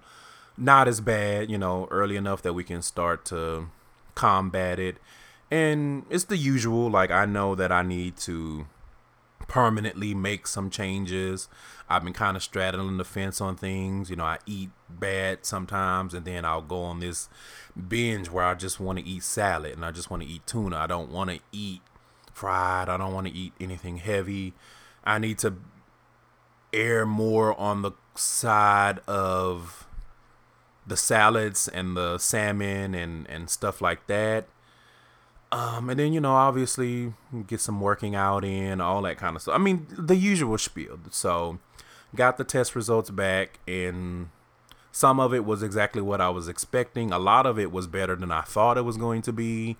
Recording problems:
none

